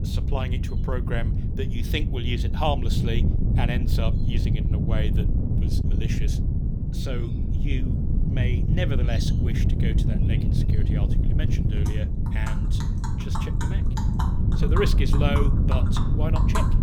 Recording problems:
wind noise on the microphone; heavy; 3 dB below the speech
animal sounds; loud; throughout; 5 dB below the speech

